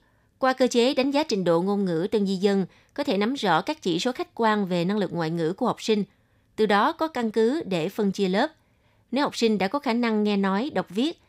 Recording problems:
none

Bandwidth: 15.5 kHz